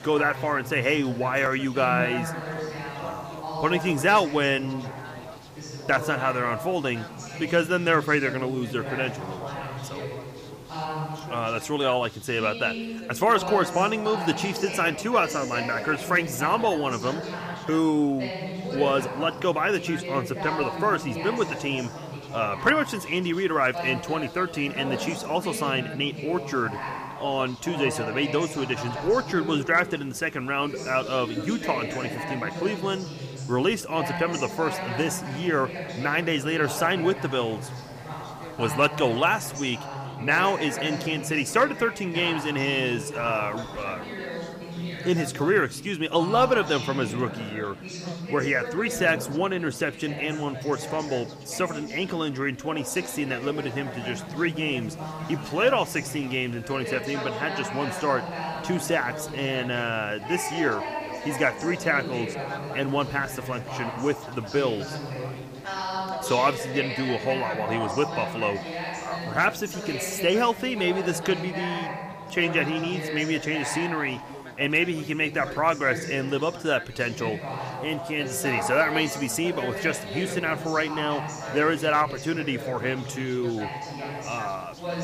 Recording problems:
background chatter; loud; throughout; 4 voices, 8 dB below the speech
hiss; faint; throughout; 25 dB below the speech

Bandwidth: 15 kHz